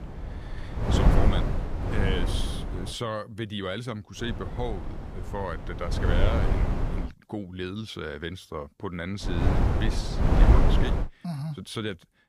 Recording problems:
wind noise on the microphone; heavy; until 3 s, from 4 to 7 s and from 9 to 11 s; 1 dB above the speech

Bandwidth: 15 kHz